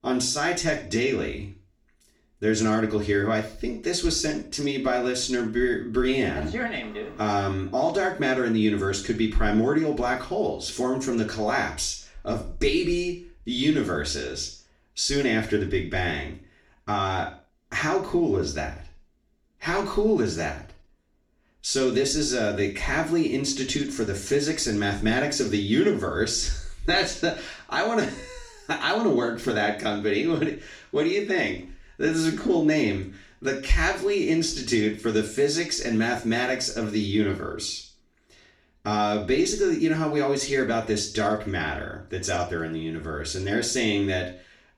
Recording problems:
off-mic speech; far
room echo; slight; dies away in 0.4 s

